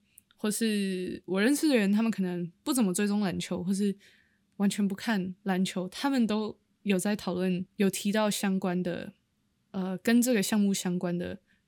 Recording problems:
none

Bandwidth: 18 kHz